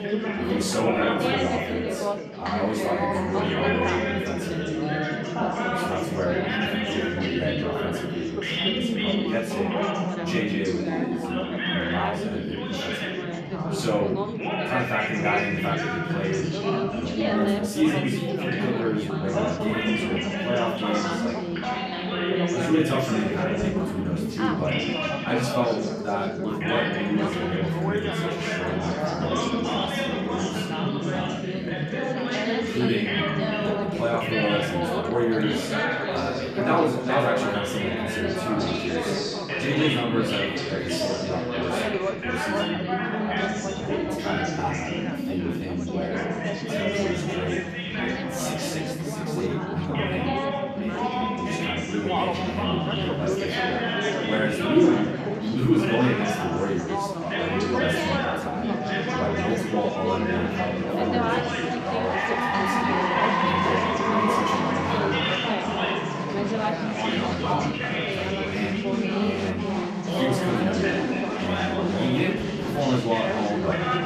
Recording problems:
off-mic speech; far
room echo; noticeable; dies away in 0.5 s
chatter from many people; very loud; throughout; 3 dB above the speech
background music; noticeable; throughout; 20 dB below the speech

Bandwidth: 14.5 kHz